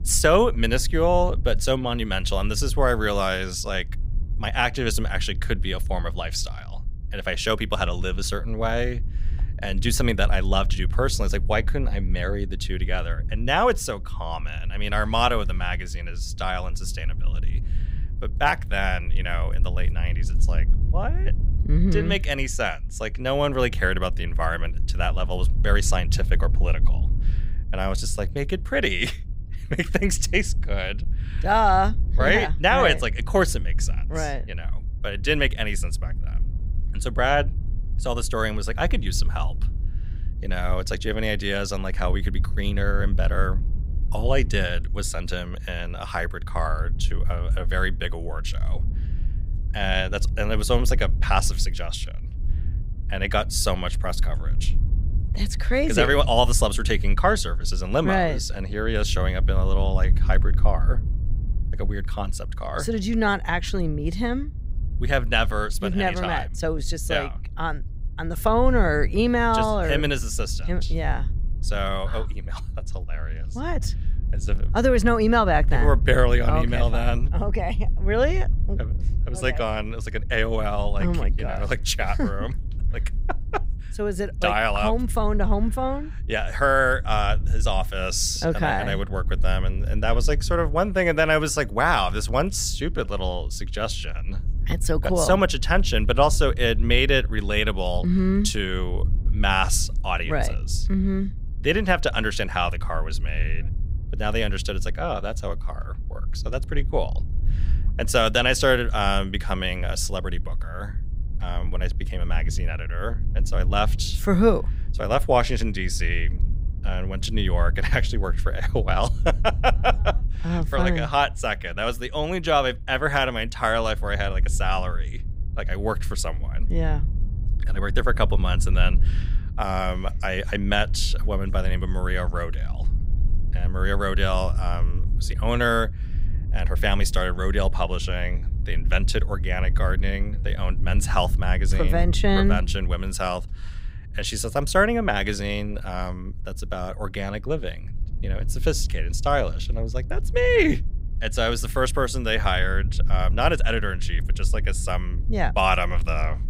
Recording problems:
low rumble; faint; throughout; 20 dB below the speech

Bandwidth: 15.5 kHz